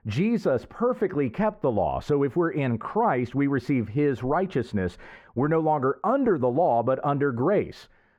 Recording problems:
muffled; very; fading above 3.5 kHz

